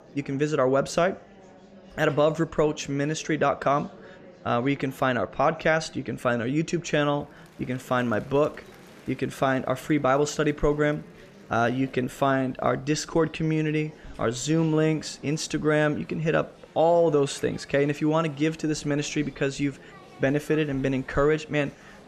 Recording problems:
murmuring crowd; faint; throughout; 25 dB below the speech

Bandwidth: 14.5 kHz